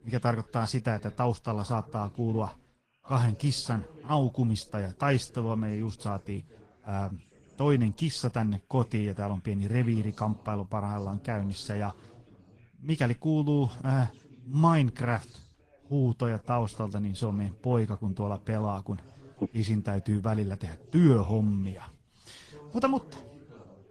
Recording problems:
garbled, watery; slightly; nothing above 15.5 kHz
background chatter; faint; throughout; 2 voices, 25 dB below the speech

